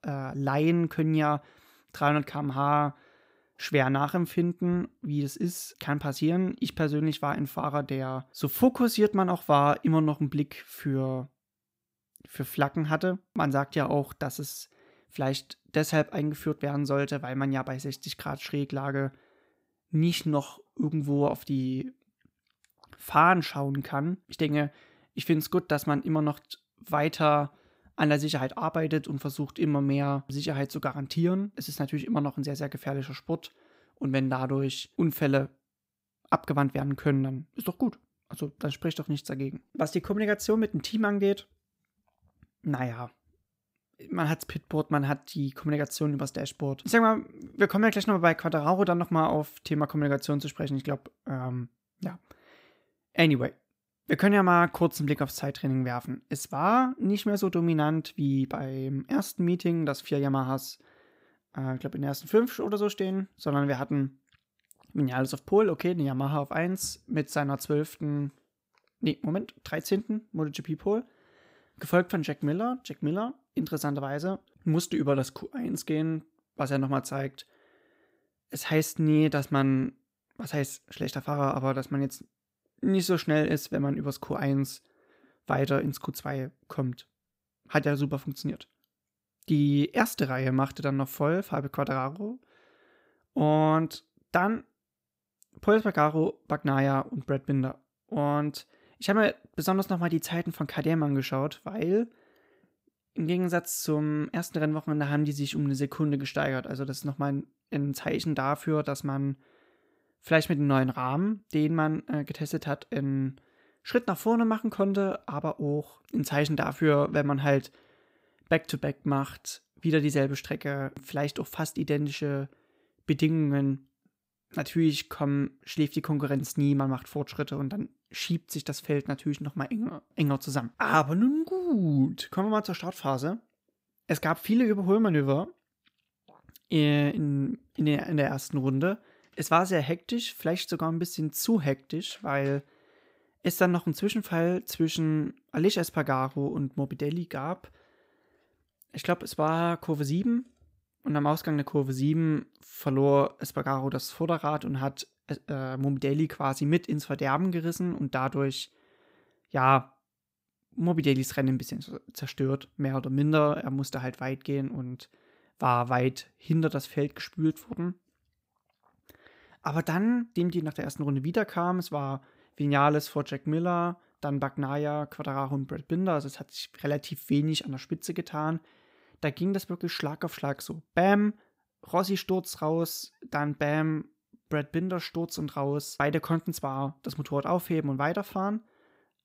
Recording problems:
none

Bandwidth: 15.5 kHz